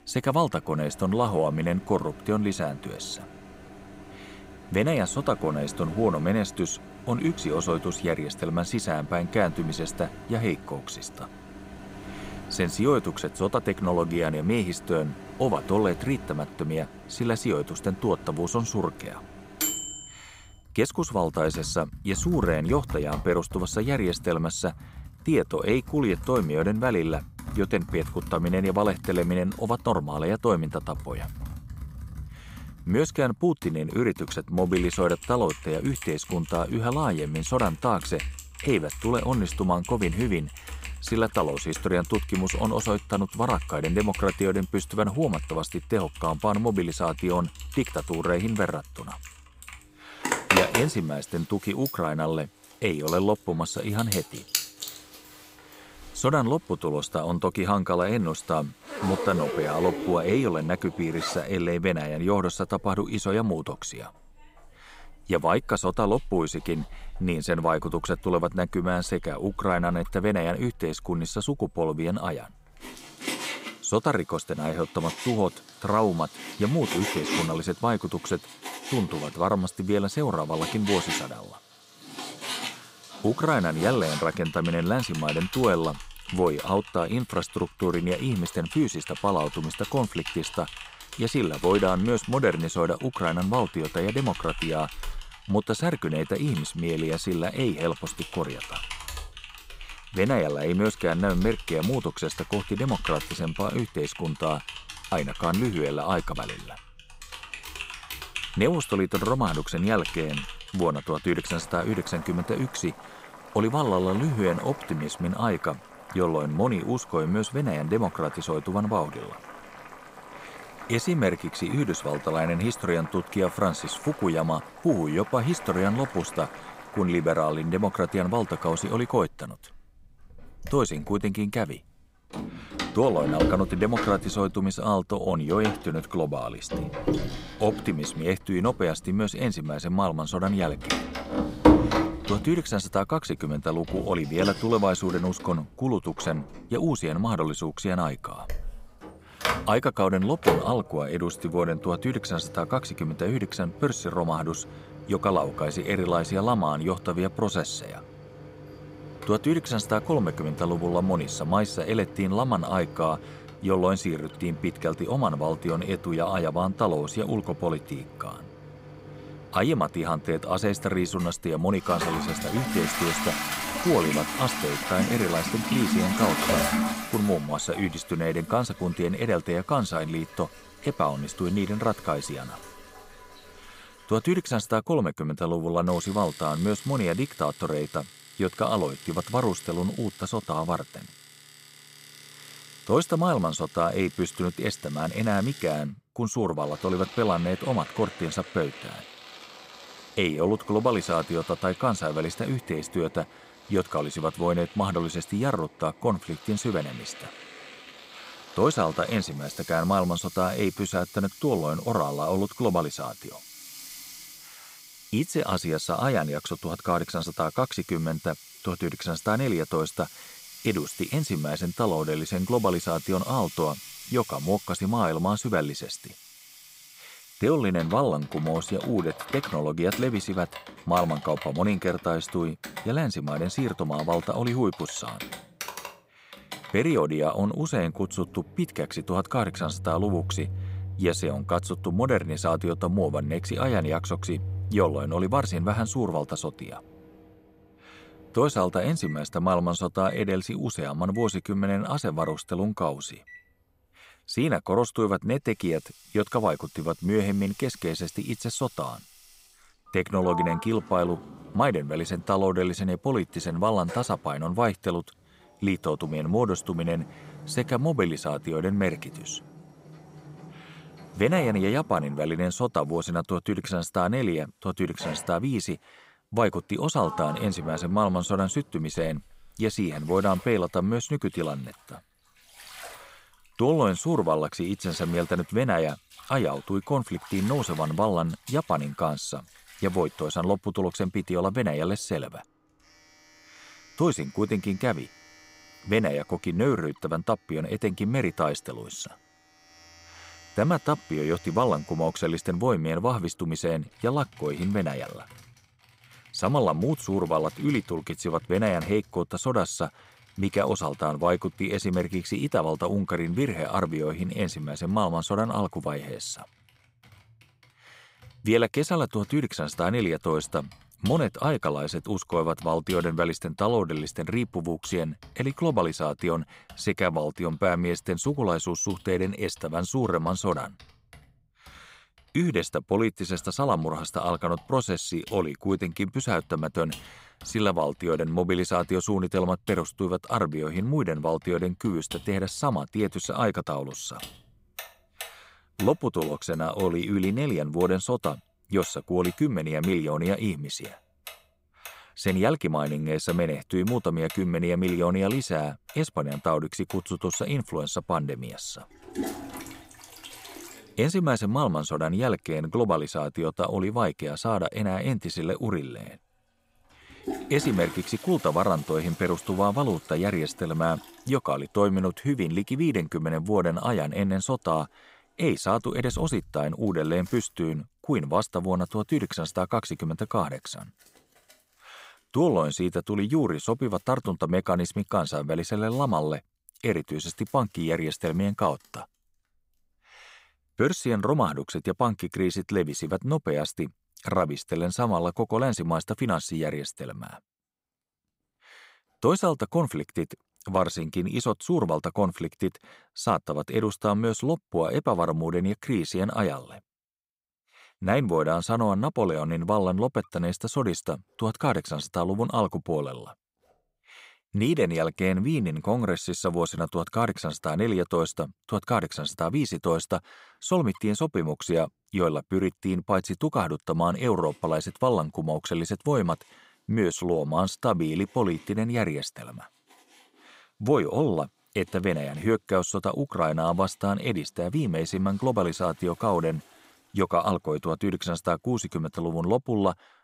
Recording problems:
household noises; noticeable; throughout; 10 dB below the speech

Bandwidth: 15.5 kHz